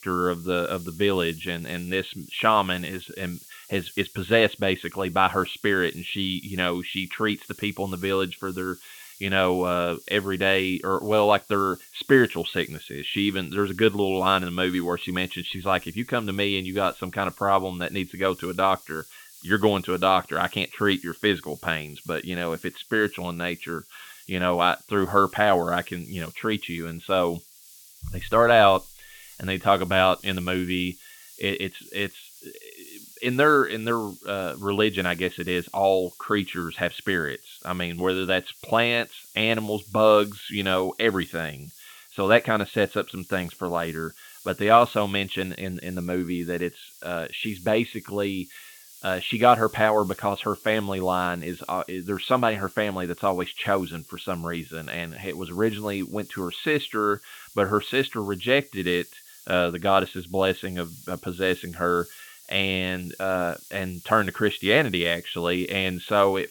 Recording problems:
high frequencies cut off; severe; nothing above 4 kHz
hiss; faint; throughout; 20 dB below the speech

